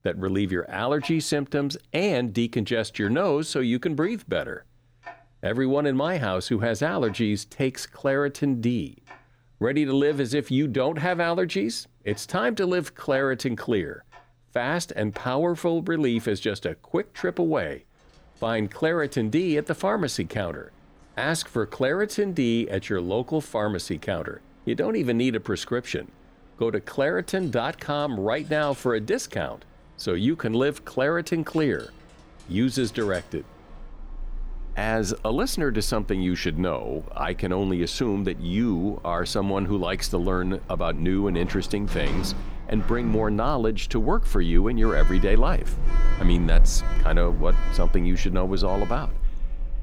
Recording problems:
household noises; loud; throughout; 7 dB below the speech

